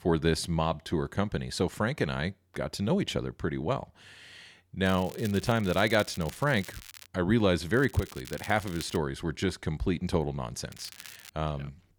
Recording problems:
crackling; noticeable; from 5 to 7 s, from 7.5 to 9 s and at 11 s; 15 dB below the speech

